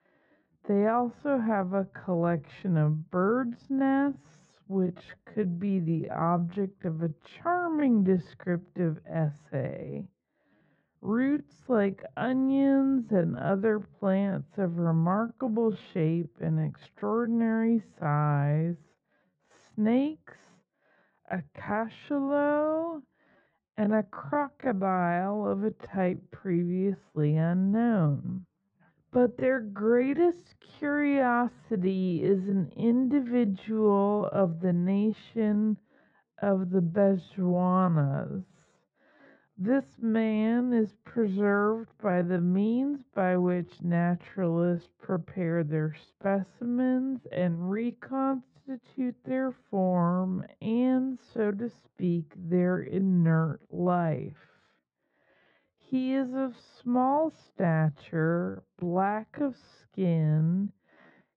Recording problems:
muffled; very; fading above 1 kHz
wrong speed, natural pitch; too slow; 0.5 times normal speed

